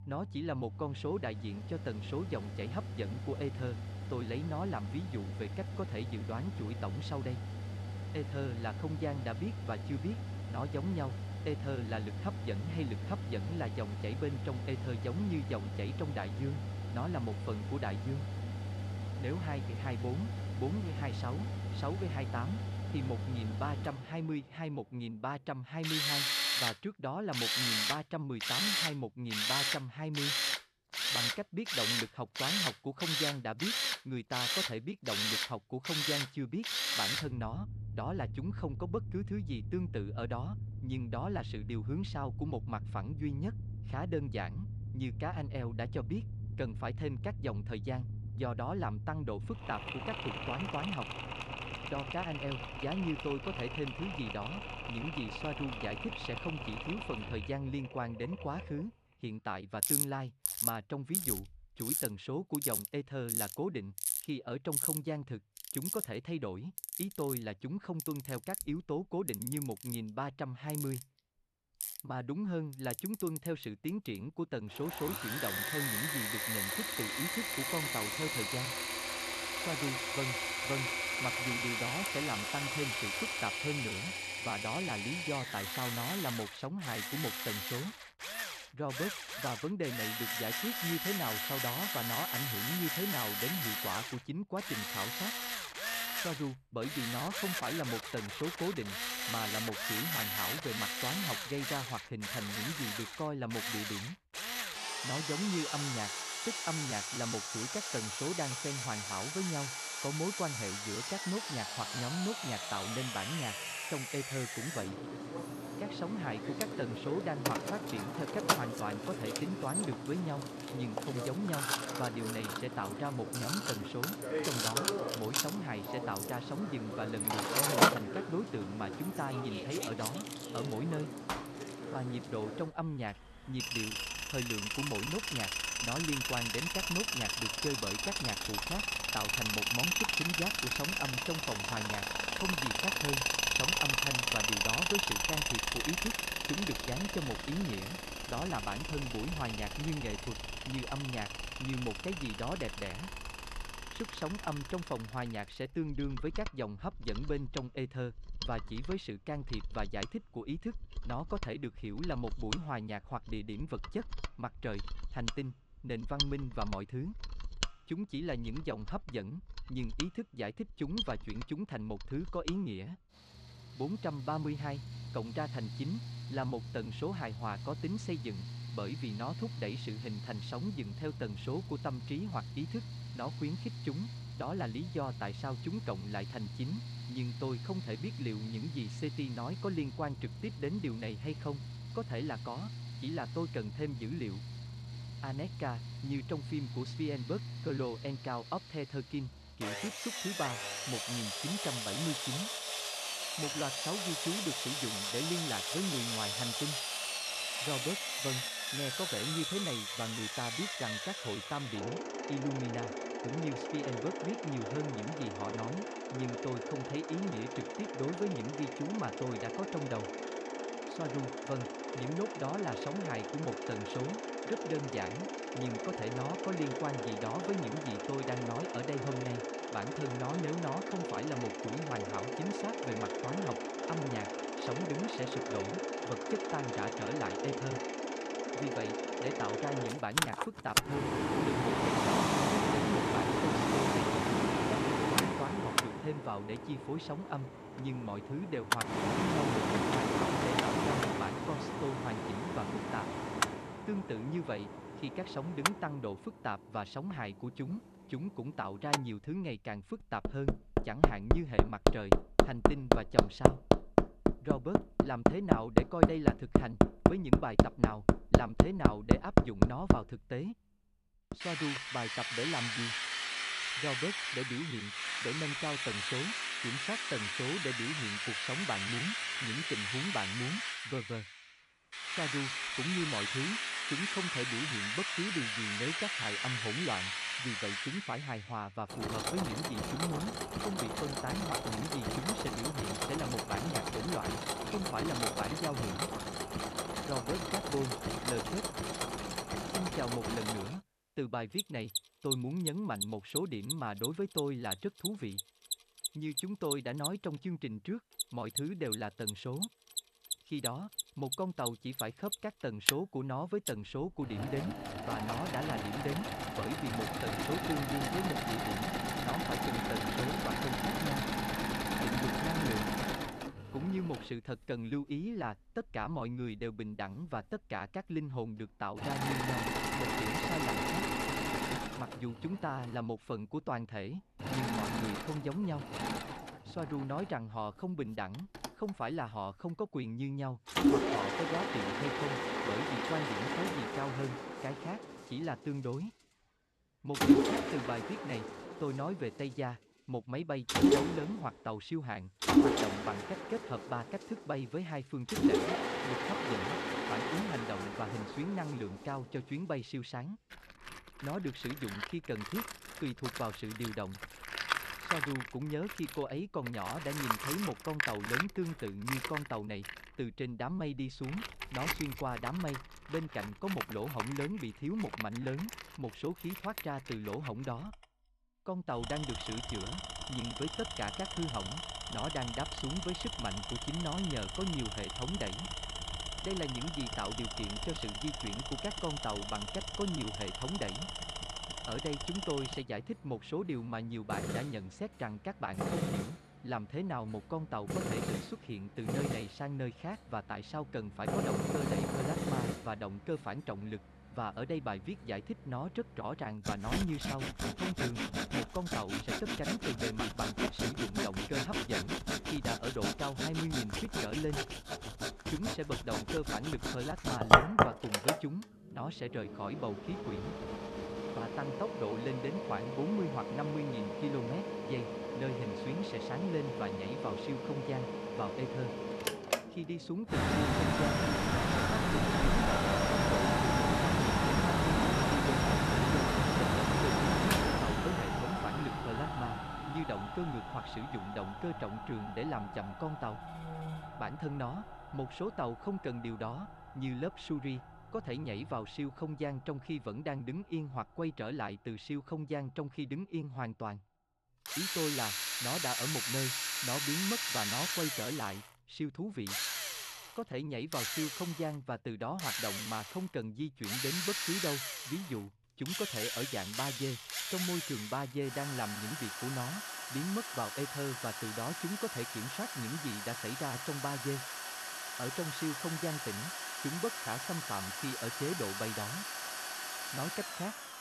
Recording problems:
machinery noise; very loud; throughout; 4 dB above the speech

